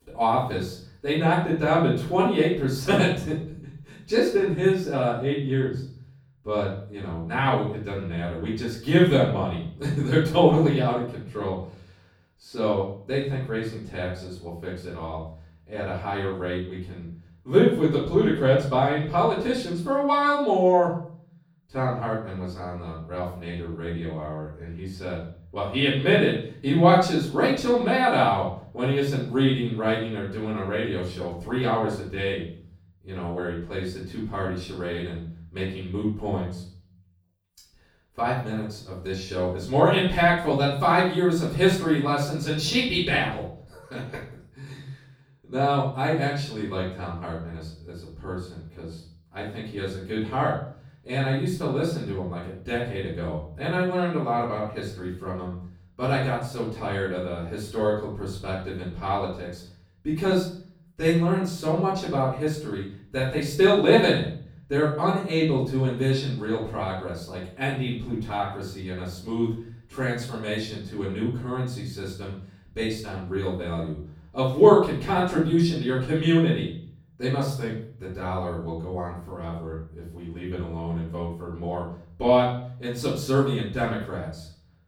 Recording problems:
off-mic speech; far
room echo; noticeable; dies away in 0.5 s

